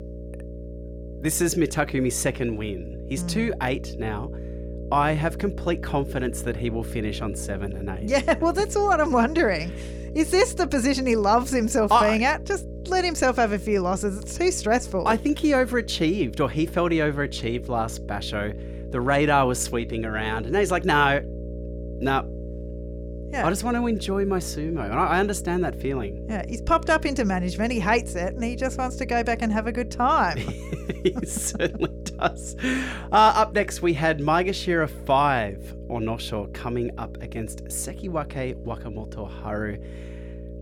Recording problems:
electrical hum; noticeable; throughout; 60 Hz, 20 dB below the speech

